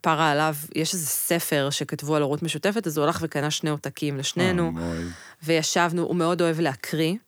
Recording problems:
none

